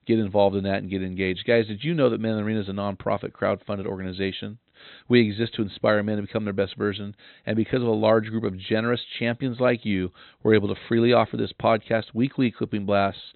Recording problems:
high frequencies cut off; severe; nothing above 4 kHz

